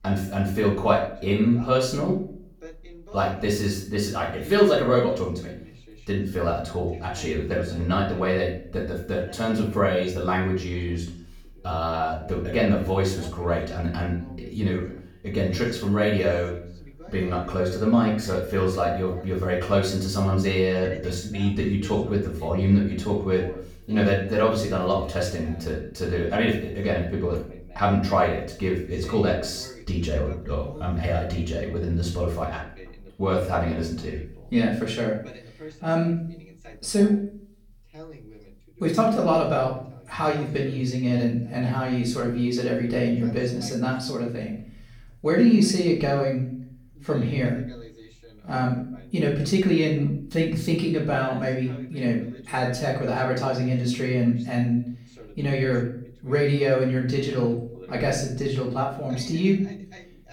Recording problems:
off-mic speech; far
room echo; noticeable; dies away in 0.5 s
voice in the background; faint; throughout; 20 dB below the speech

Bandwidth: 18 kHz